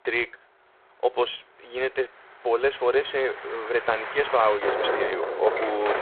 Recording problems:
phone-call audio; poor line
traffic noise; loud; throughout; 4 dB below the speech

